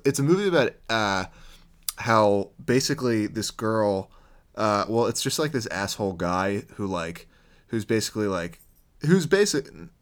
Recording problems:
none

